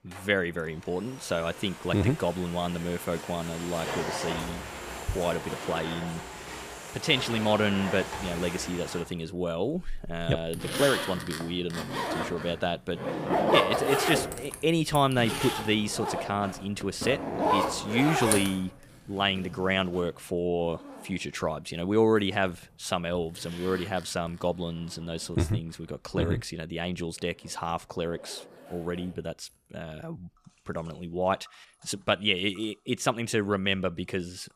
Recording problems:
household noises; loud; throughout; 3 dB below the speech

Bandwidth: 15 kHz